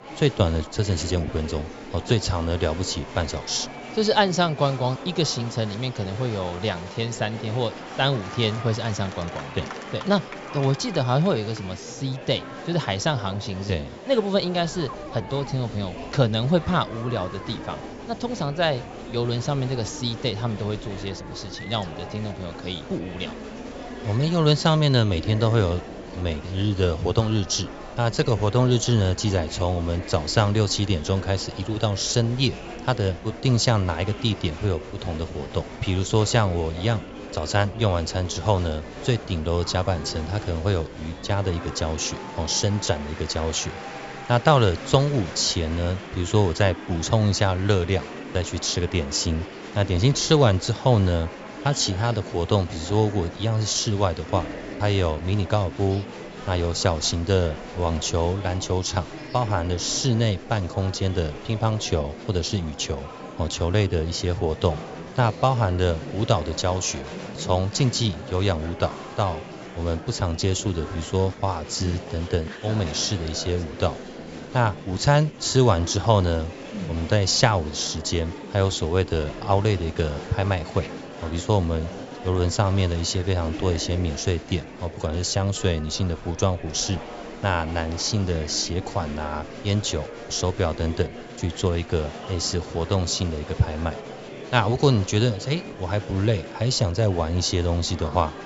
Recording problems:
high frequencies cut off; noticeable; nothing above 8 kHz
murmuring crowd; noticeable; throughout; 15 dB below the speech

